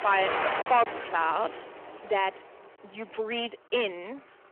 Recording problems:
phone-call audio; nothing above 3 kHz
distortion; slight; 5% of the sound clipped
traffic noise; loud; throughout; 5 dB below the speech
choppy; occasionally; at 0.5 s; 3% of the speech affected

